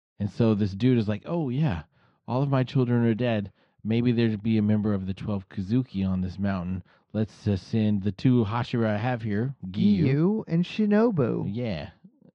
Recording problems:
muffled; very; fading above 3 kHz

